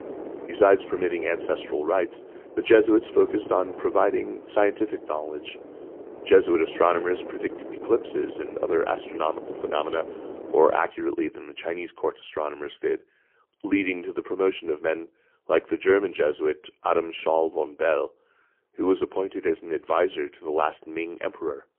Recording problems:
phone-call audio; poor line; nothing above 3 kHz
muffled; very slightly; fading above 3.5 kHz
wind noise on the microphone; occasional gusts; until 11 s; 15 dB below the speech

